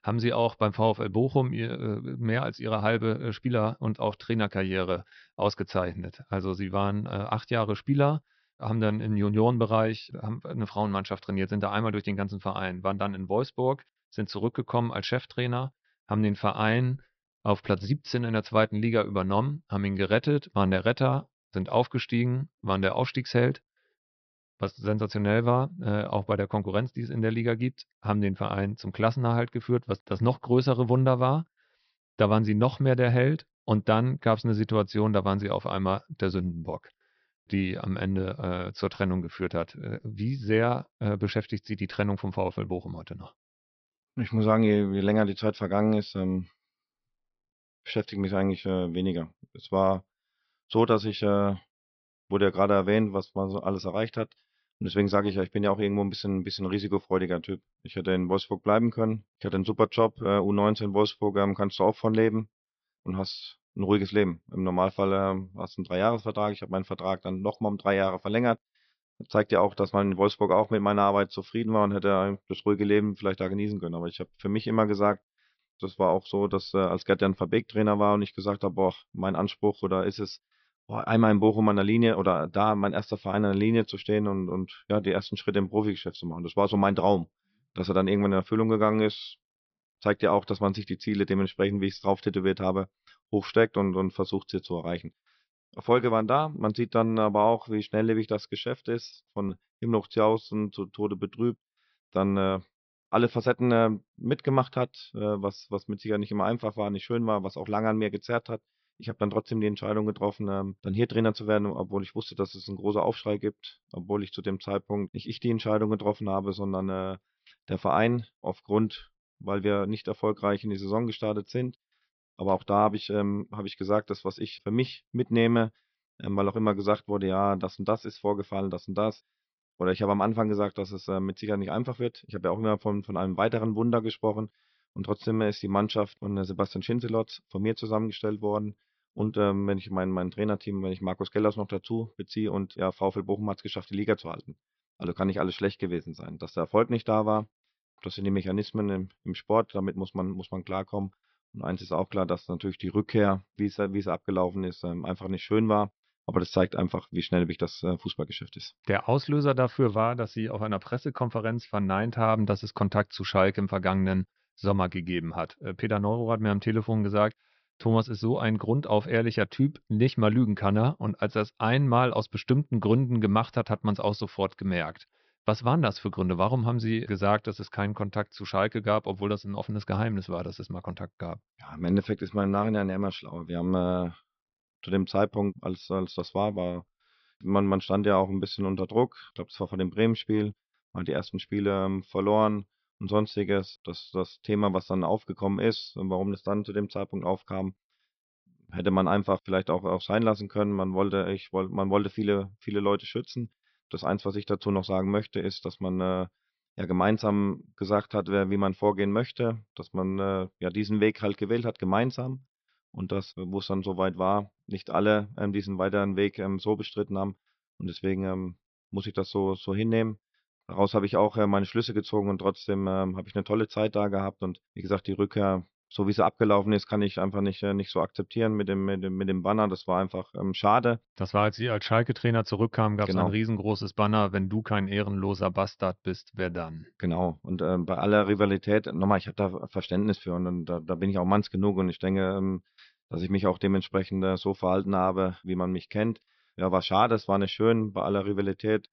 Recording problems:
high frequencies cut off; noticeable; nothing above 5.5 kHz

